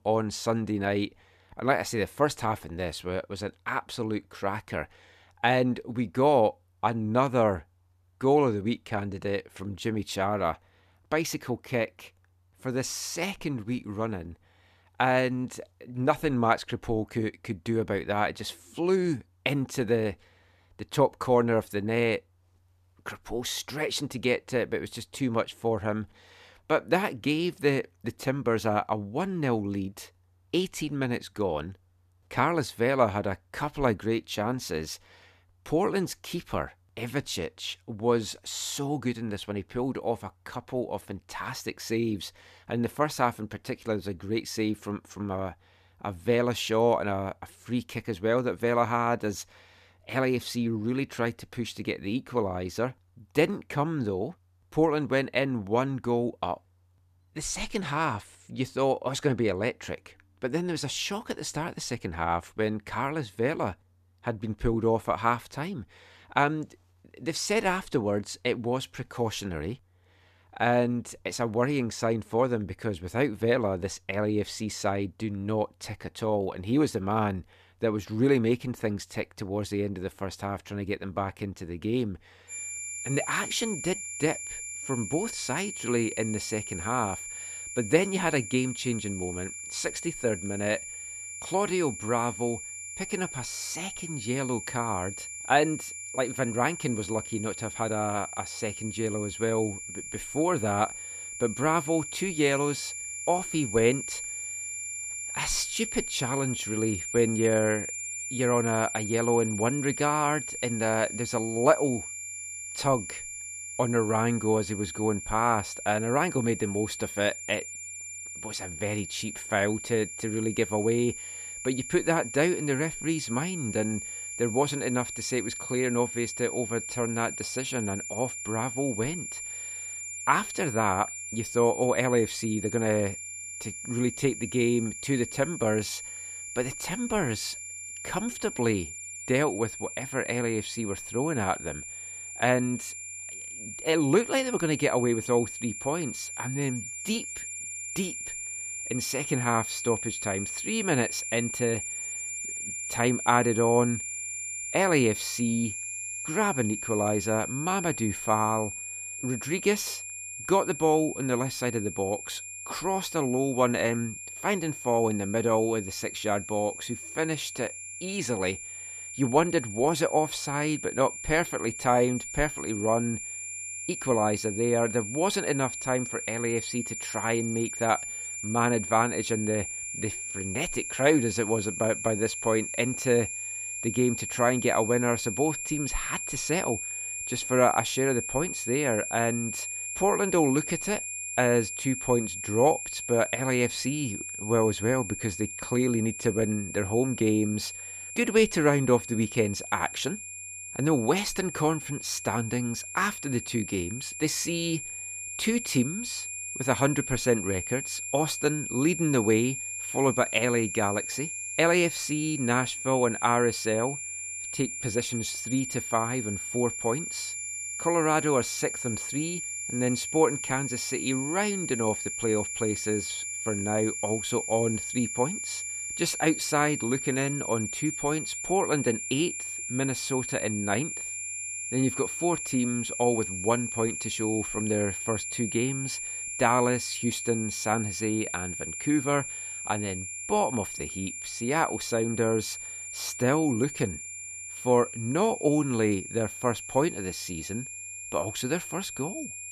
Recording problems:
high-pitched whine; loud; from 1:23 on; 7 kHz, 6 dB below the speech

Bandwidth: 14.5 kHz